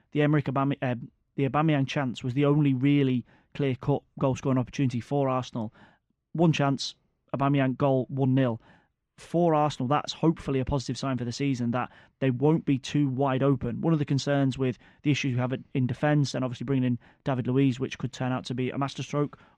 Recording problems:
muffled; slightly; fading above 3 kHz

